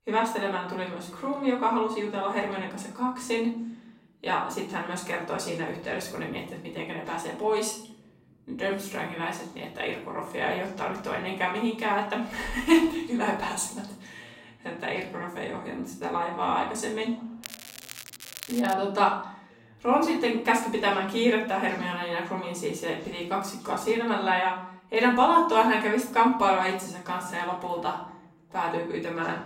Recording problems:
off-mic speech; far
room echo; noticeable; dies away in 0.5 s
crackling; noticeable; from 17 to 19 s, mostly in the pauses; 15 dB below the speech
voice in the background; faint; throughout; 30 dB below the speech

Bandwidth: 16 kHz